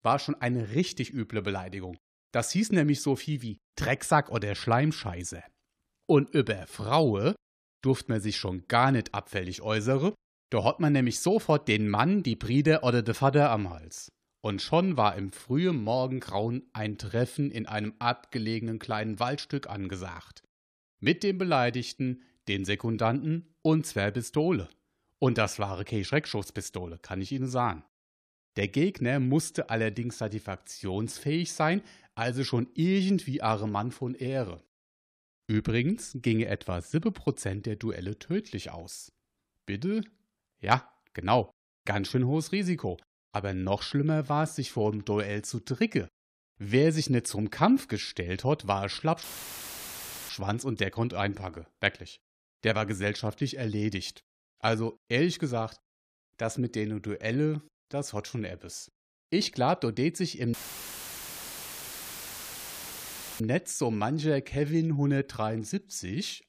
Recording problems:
audio cutting out; filled with static; at 49 s for 1 s and at 1:01 for 3 s

